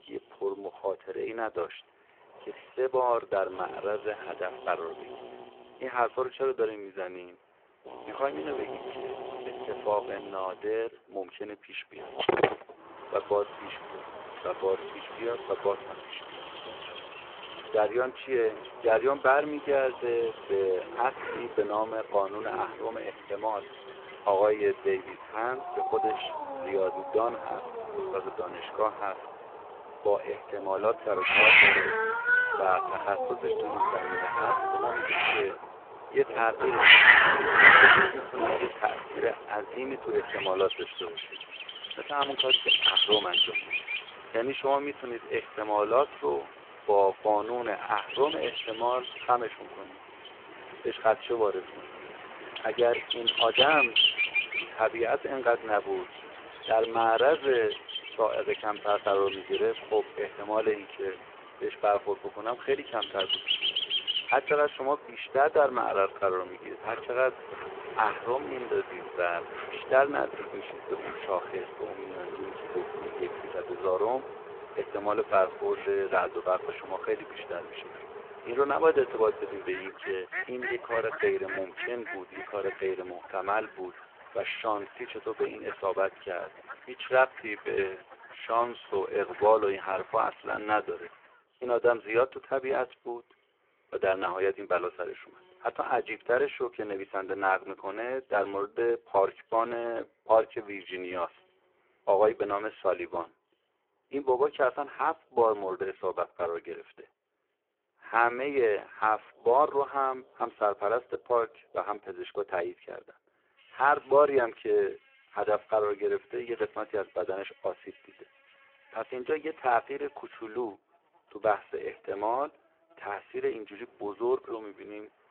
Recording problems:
phone-call audio; poor line
animal sounds; very loud; throughout; 3 dB above the speech

